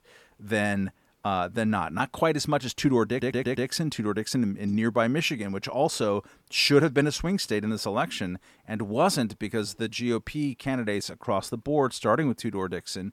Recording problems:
audio stuttering; at 3 s

